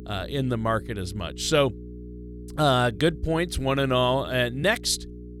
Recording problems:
electrical hum; faint; throughout; 60 Hz, 20 dB below the speech

